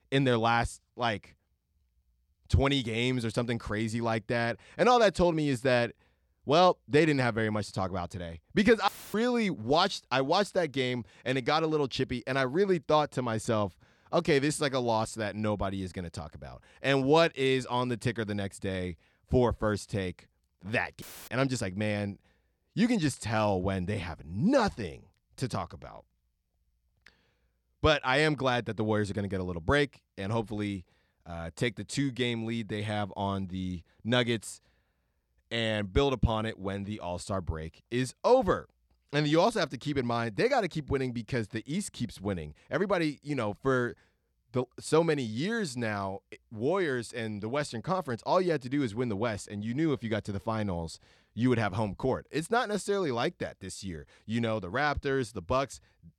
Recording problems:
audio cutting out; filled with static; at 9 s and at 21 s

